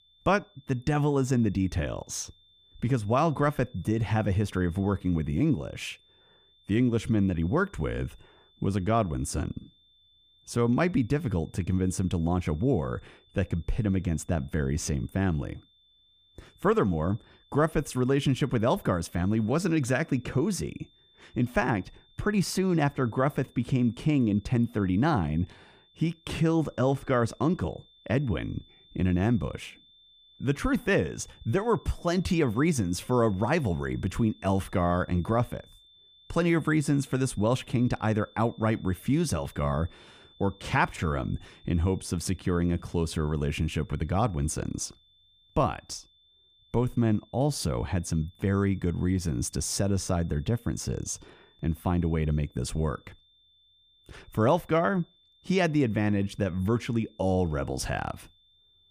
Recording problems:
high-pitched whine; faint; throughout; 3.5 kHz, 30 dB below the speech

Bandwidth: 15 kHz